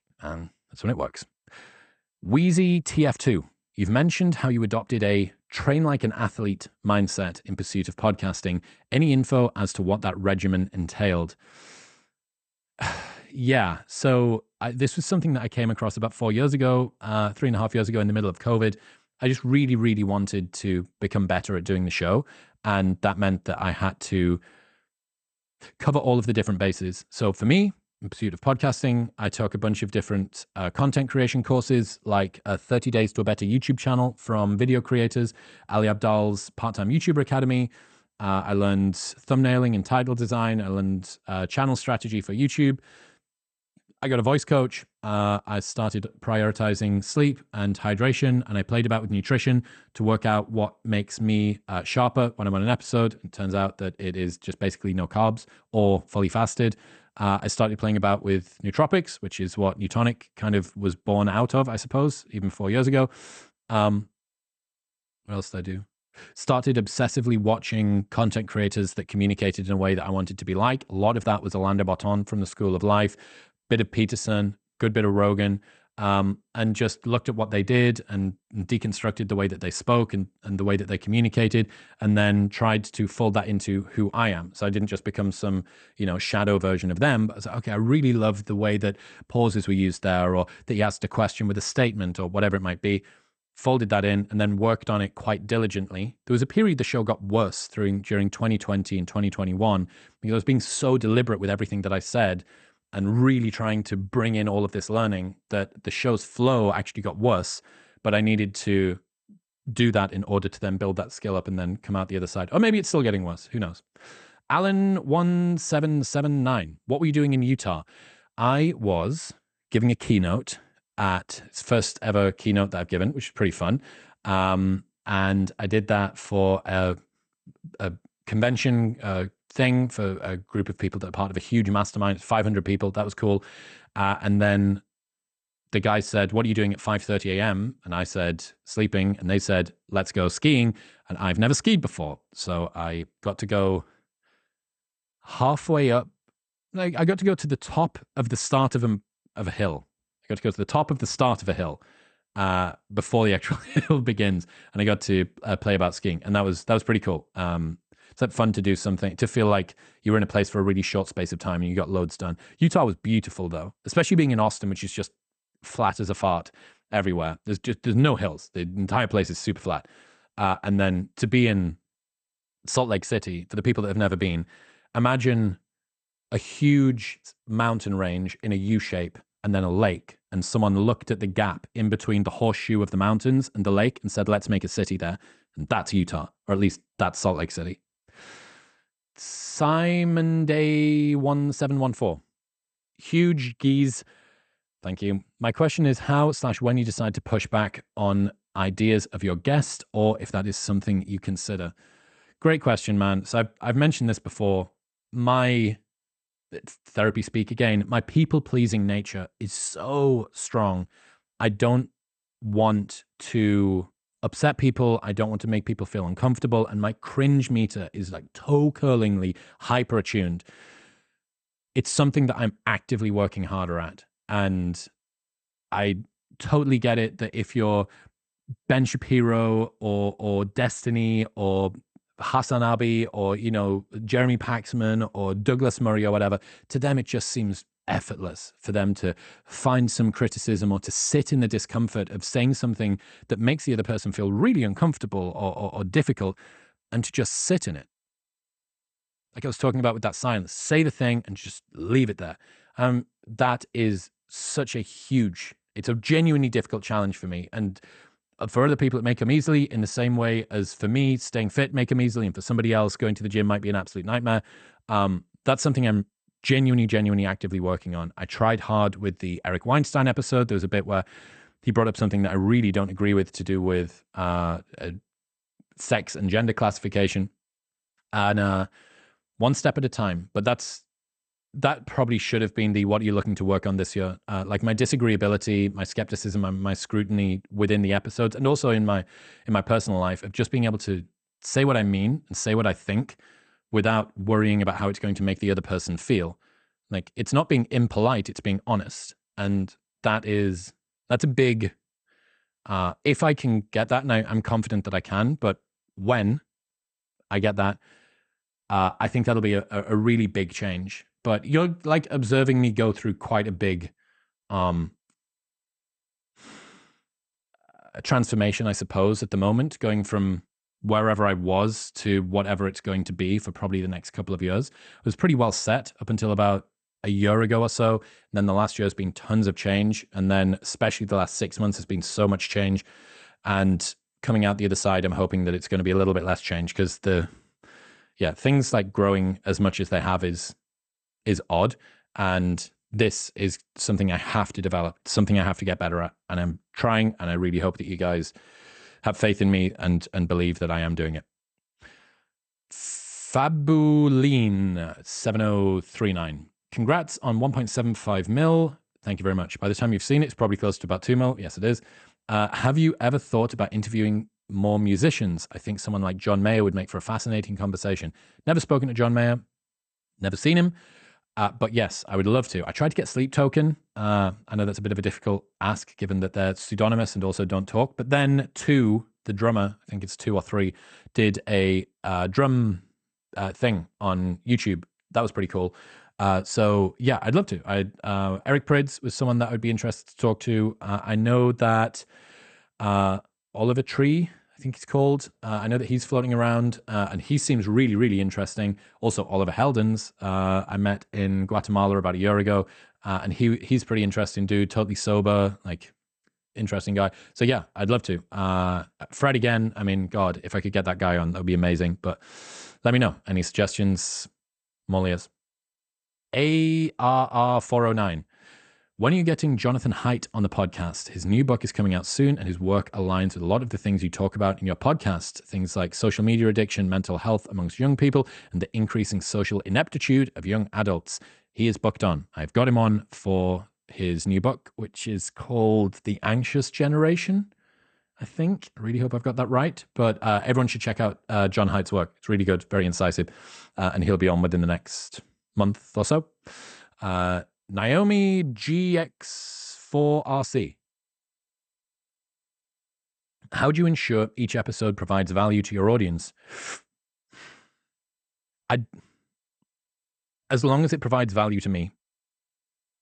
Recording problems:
garbled, watery; slightly; nothing above 8.5 kHz

